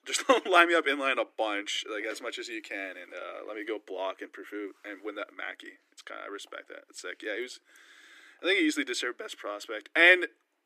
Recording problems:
thin; somewhat; fading below 300 Hz

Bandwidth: 15 kHz